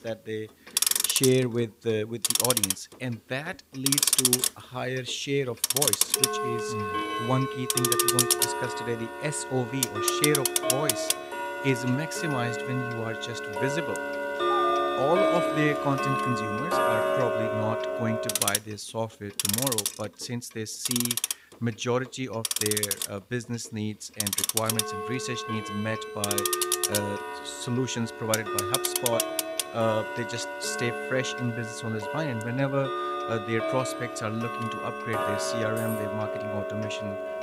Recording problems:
household noises; very loud; throughout; 4 dB above the speech
dog barking; noticeable; from 14 to 16 s; peak 4 dB below the speech
jangling keys; faint; at 36 s; peak 10 dB below the speech

